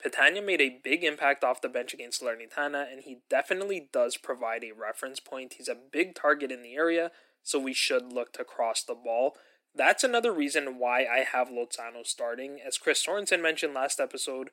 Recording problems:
thin; somewhat; fading below 300 Hz

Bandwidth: 16 kHz